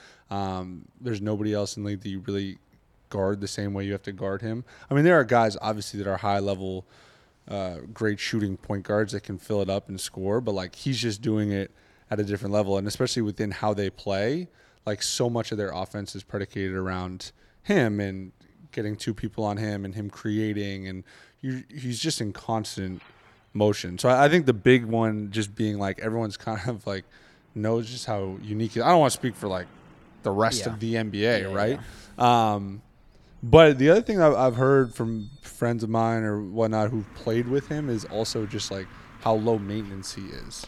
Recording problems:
traffic noise; faint; throughout; 30 dB below the speech

